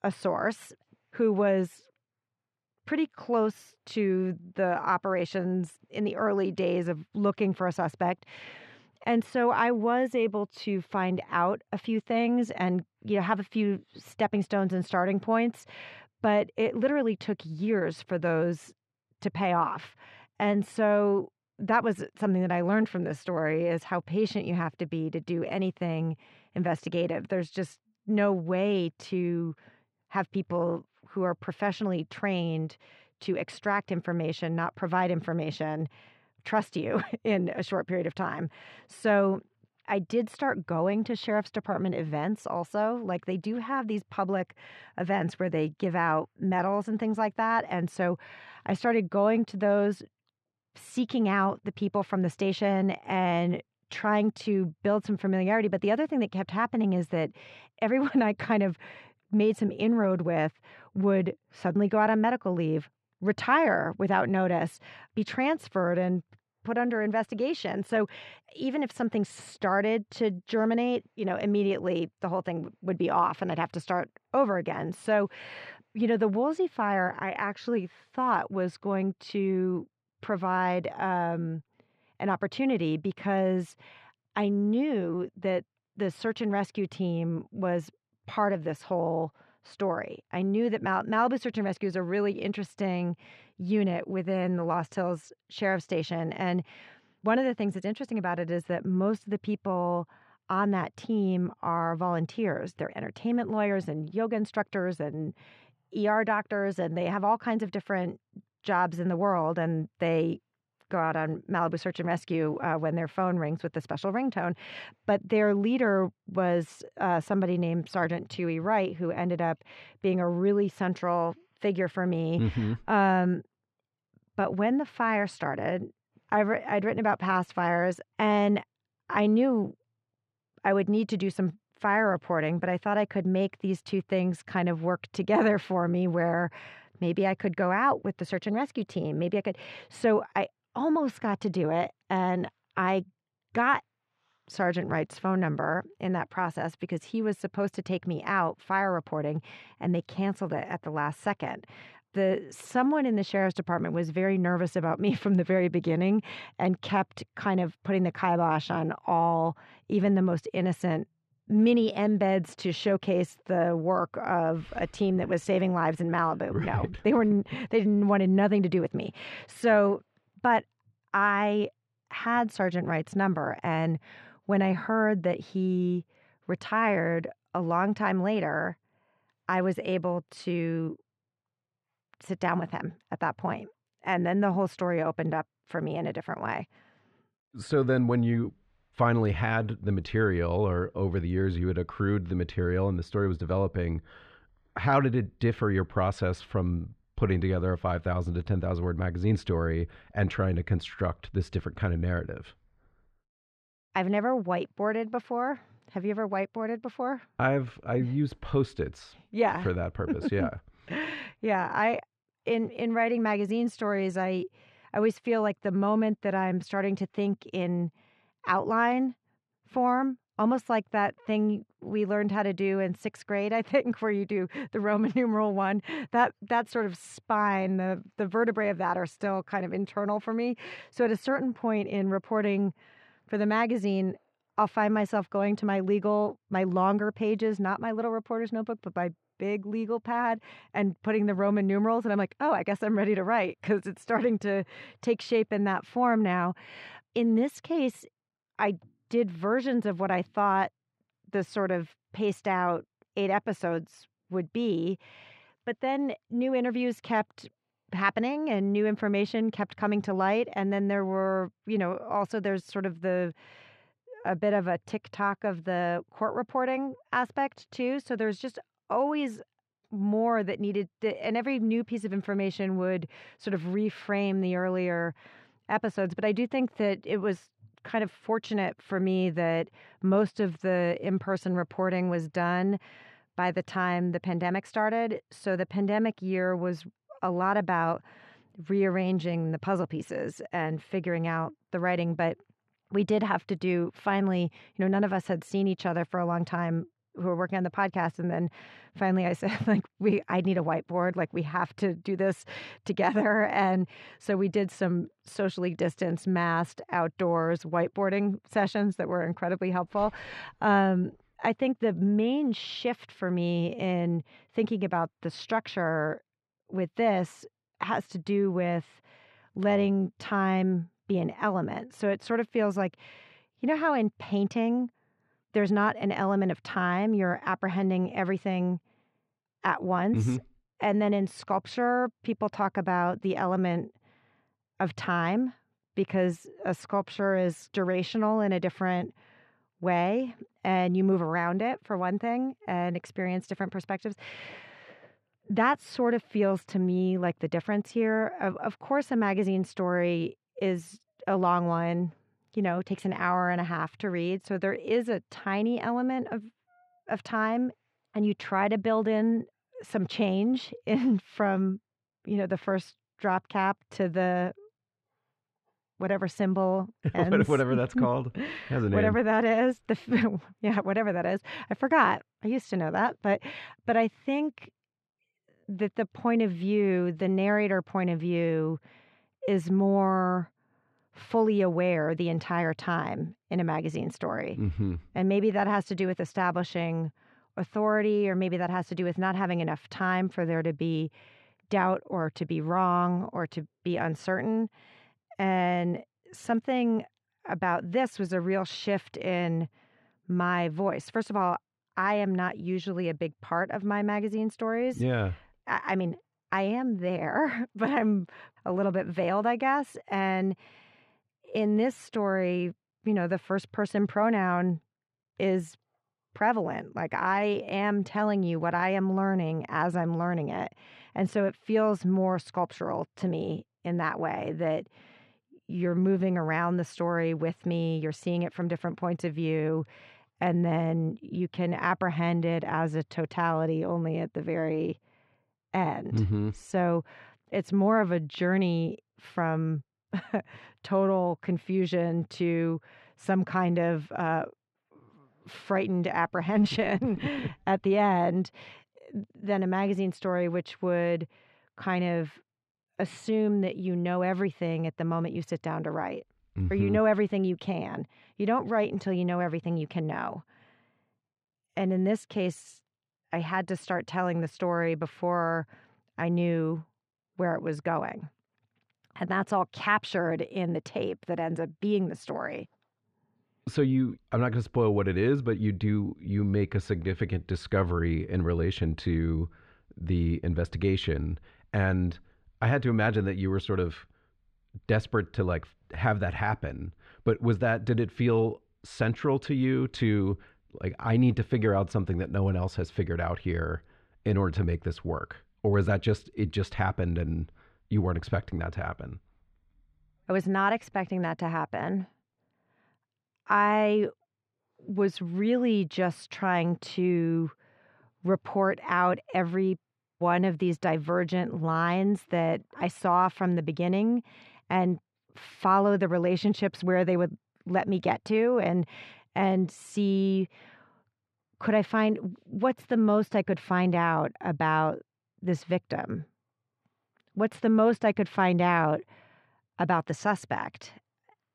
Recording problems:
muffled; slightly; fading above 3 kHz

